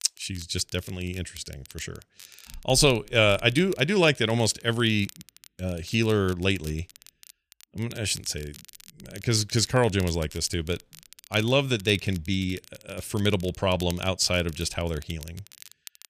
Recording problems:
crackle, like an old record; faint; 20 dB below the speech

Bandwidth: 14.5 kHz